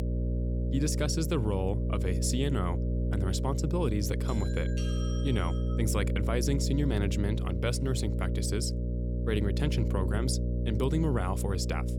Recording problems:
electrical hum; loud; throughout; 60 Hz, 6 dB below the speech
doorbell; noticeable; from 4.5 to 6 s; peak 10 dB below the speech

